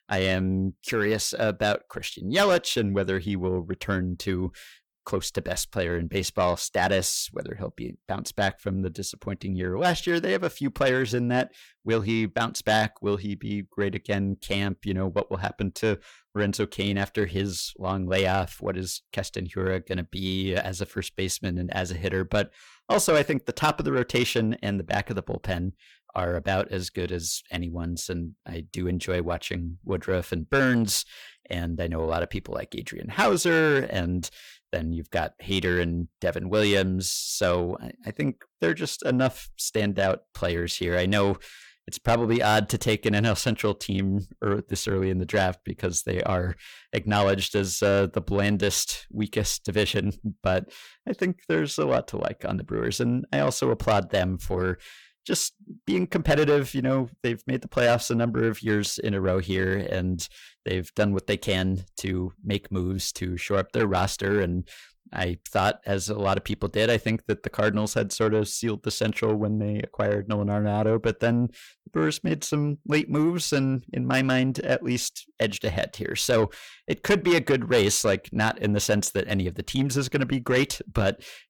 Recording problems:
distortion; slight; 10 dB below the speech

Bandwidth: 19 kHz